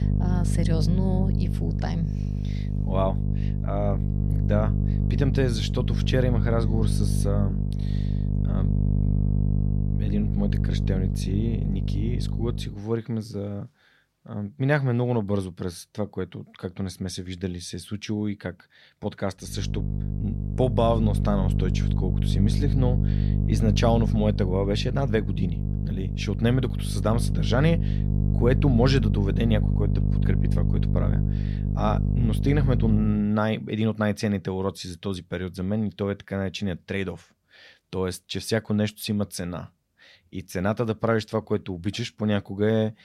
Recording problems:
electrical hum; loud; until 13 s and from 20 to 33 s; 50 Hz, 7 dB below the speech

